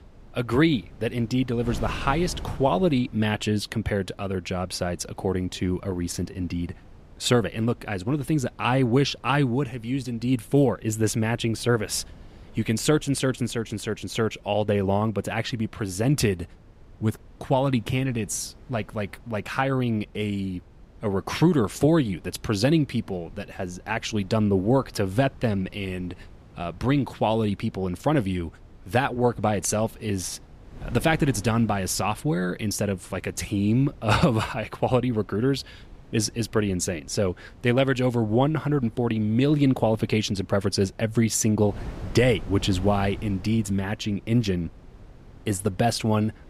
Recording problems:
wind noise on the microphone; occasional gusts; 25 dB below the speech

